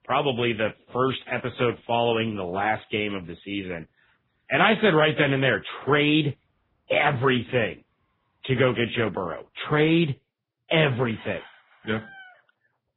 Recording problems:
garbled, watery; badly; nothing above 3.5 kHz
animal sounds; faint; throughout; 25 dB below the speech

